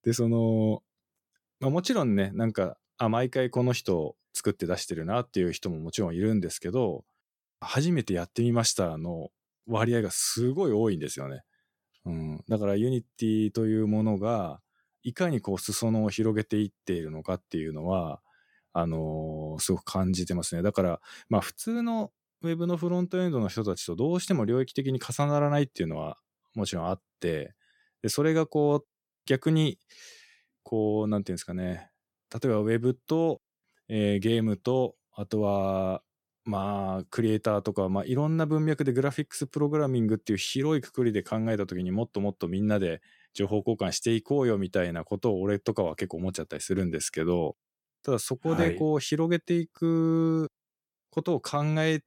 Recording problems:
none

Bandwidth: 17 kHz